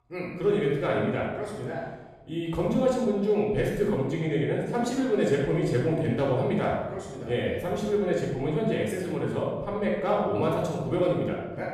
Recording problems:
off-mic speech; far
room echo; noticeable; dies away in 1 s

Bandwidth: 14.5 kHz